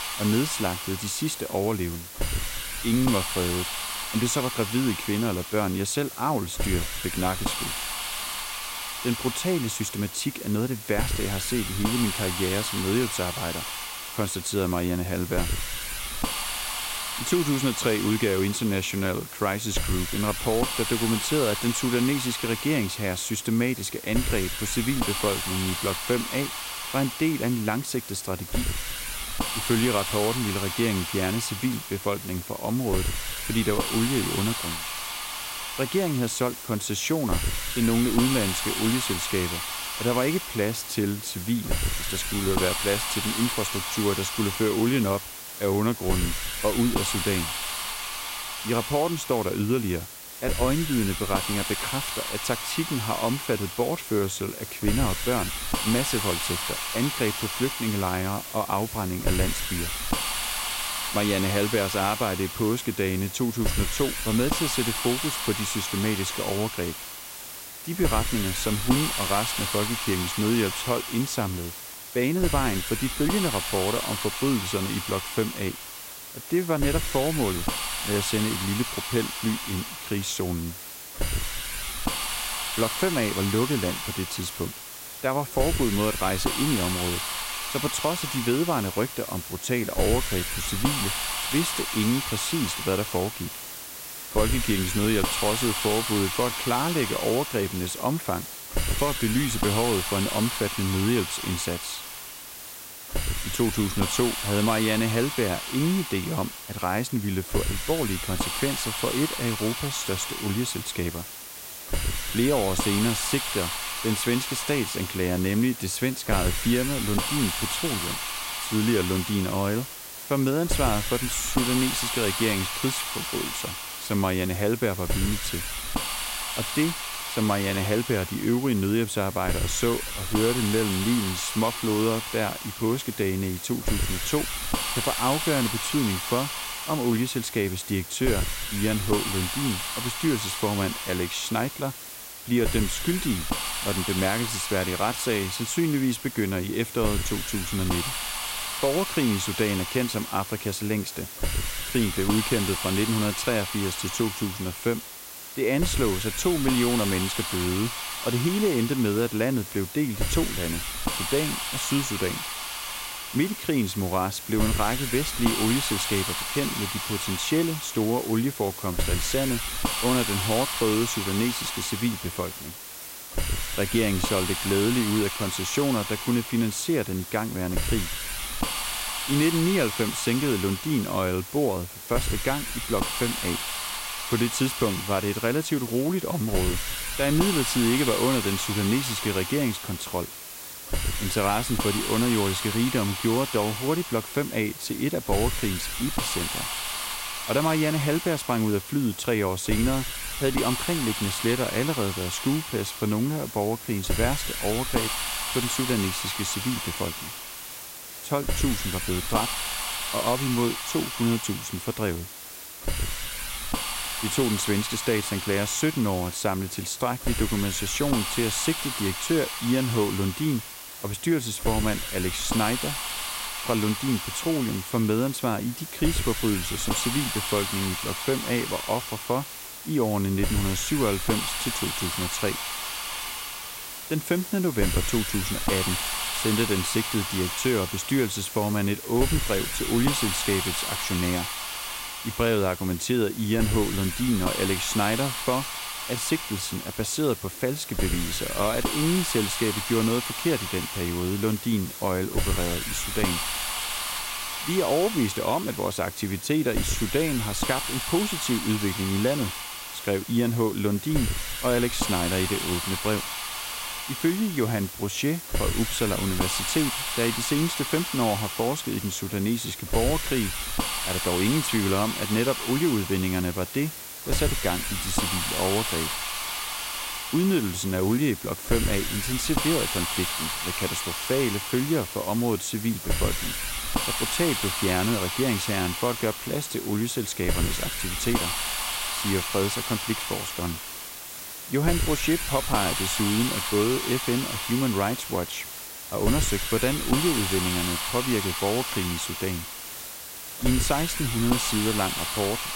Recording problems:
hiss; loud; throughout; 3 dB below the speech

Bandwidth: 16 kHz